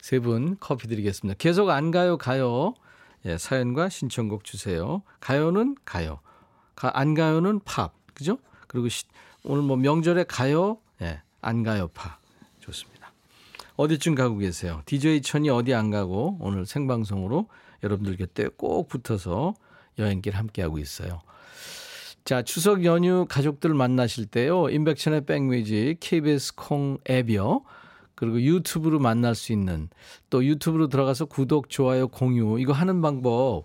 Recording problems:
none

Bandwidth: 16 kHz